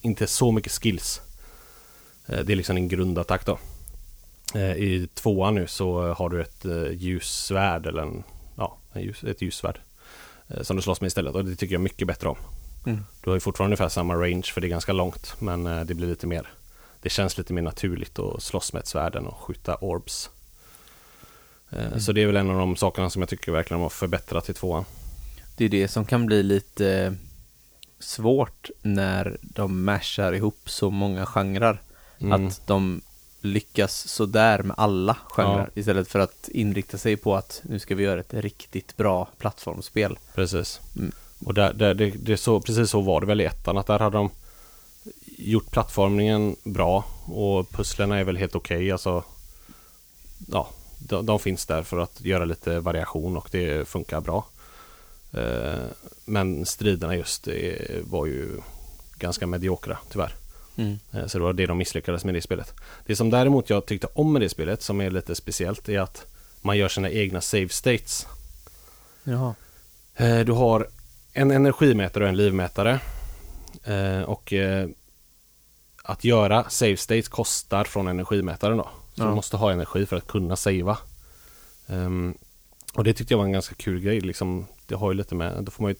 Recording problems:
hiss; faint; throughout; 25 dB below the speech

